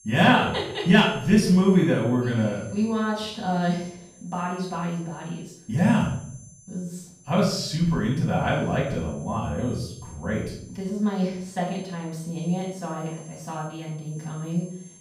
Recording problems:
off-mic speech; far
room echo; noticeable; dies away in 0.5 s
high-pitched whine; faint; throughout; 6.5 kHz, 25 dB below the speech

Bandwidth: 15 kHz